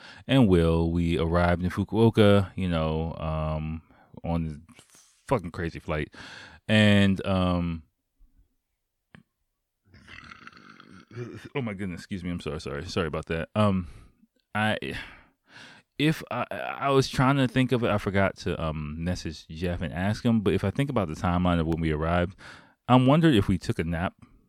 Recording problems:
none

